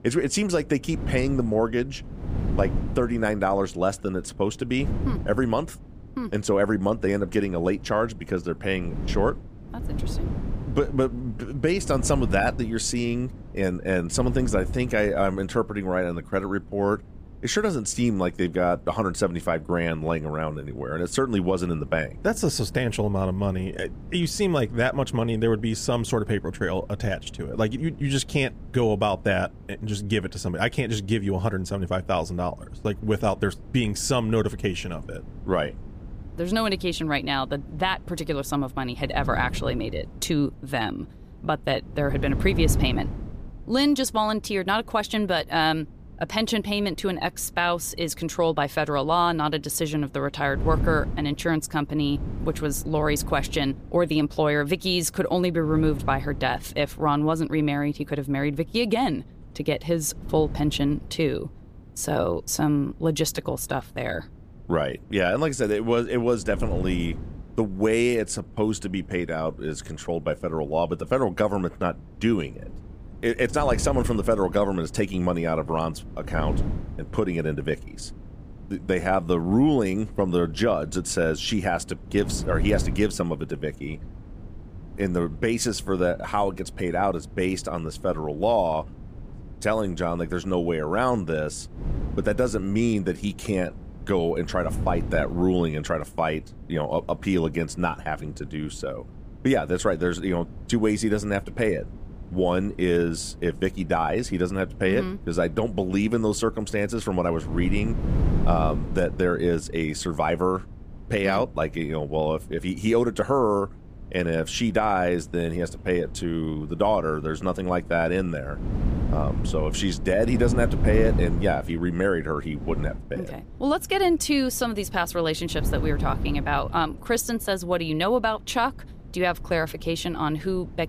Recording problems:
wind noise on the microphone; occasional gusts; 20 dB below the speech

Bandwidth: 15 kHz